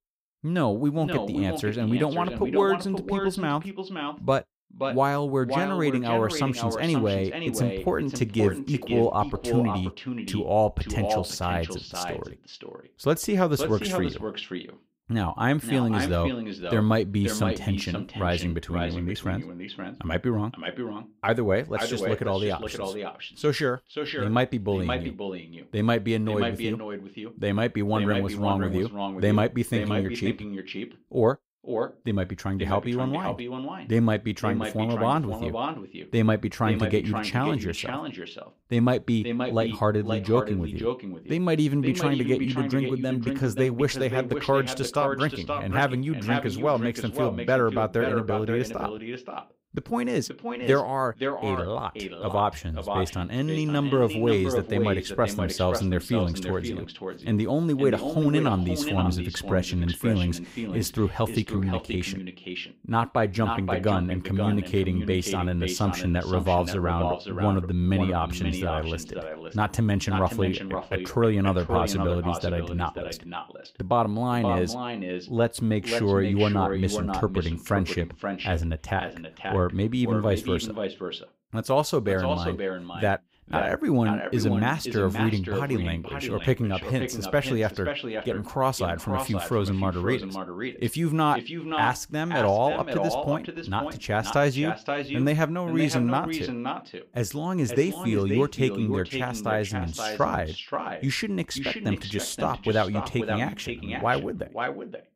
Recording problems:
echo of what is said; strong; throughout; 530 ms later, 6 dB below the speech

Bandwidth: 15.5 kHz